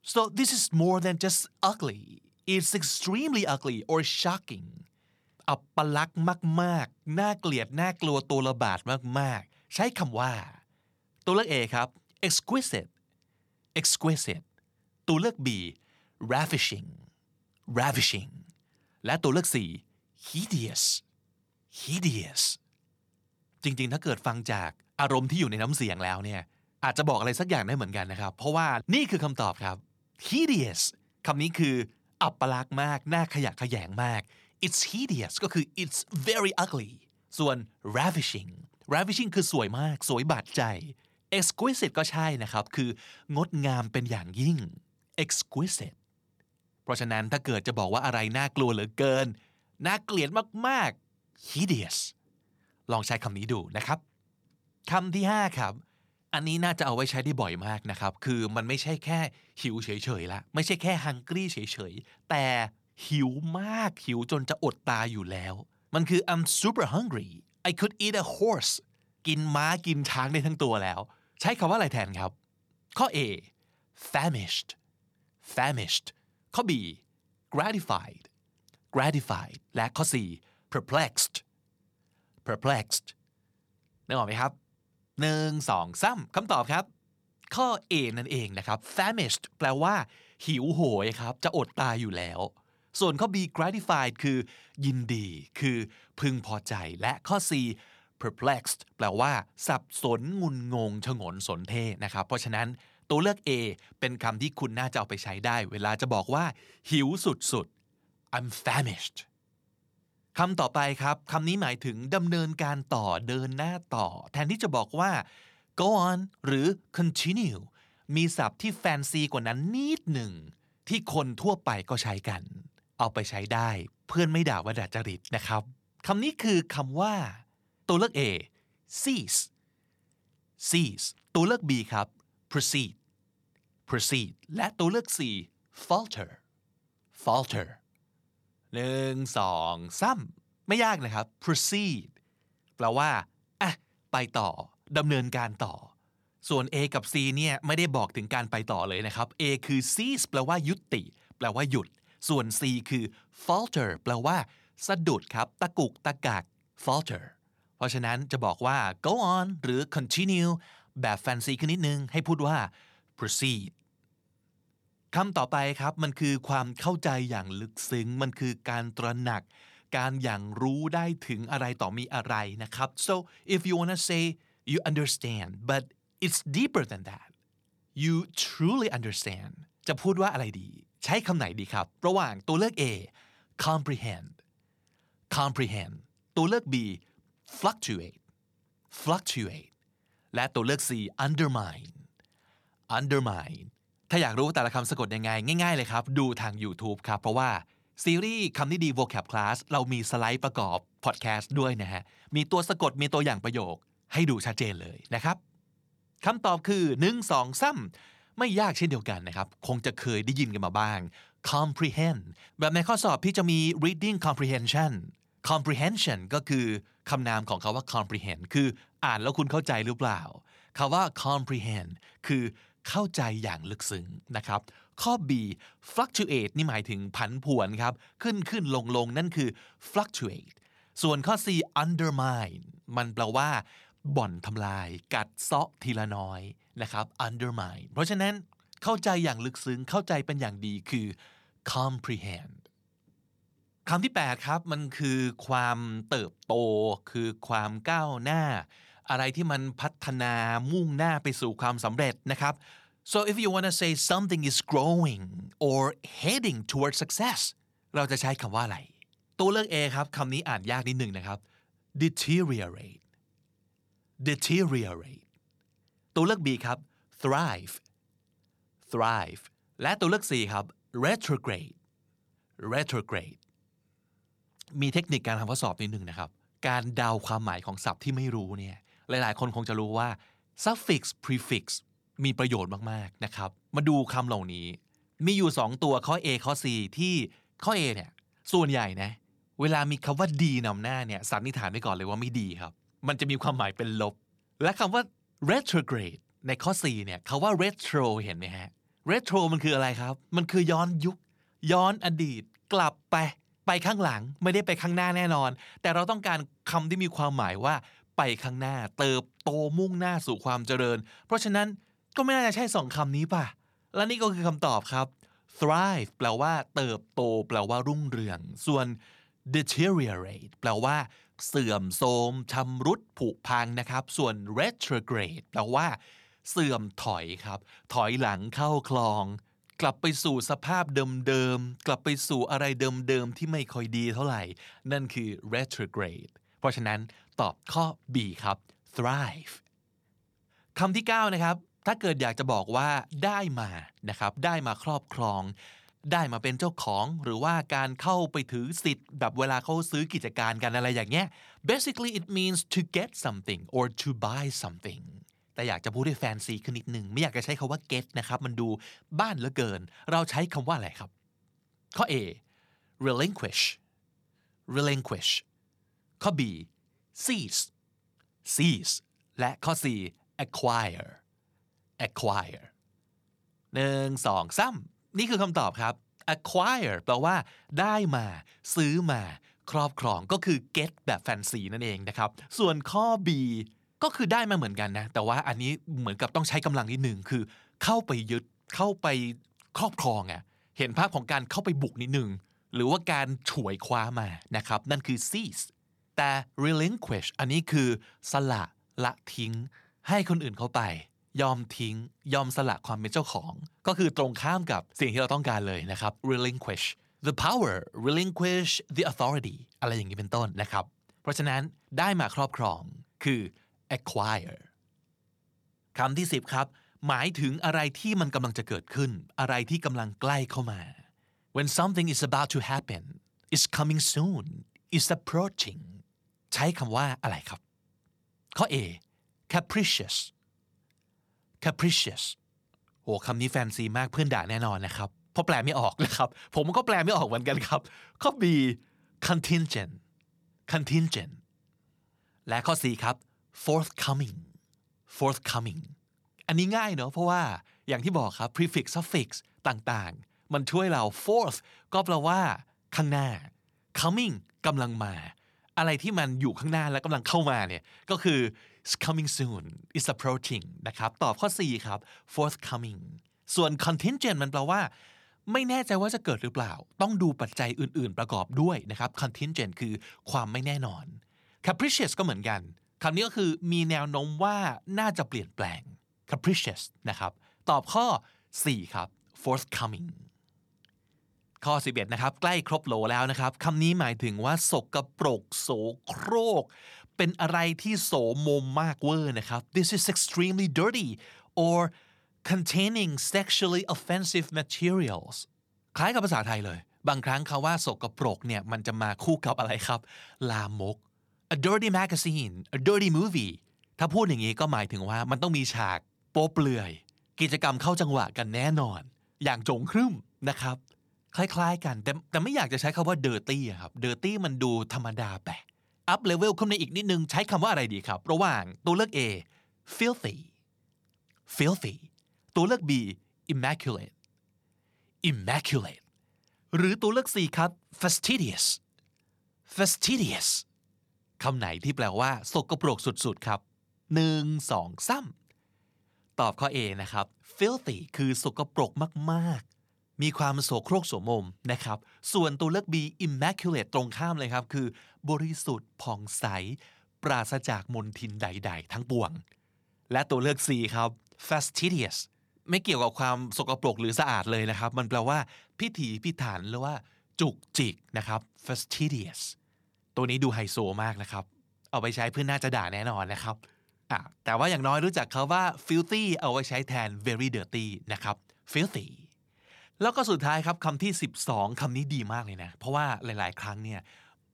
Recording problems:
none

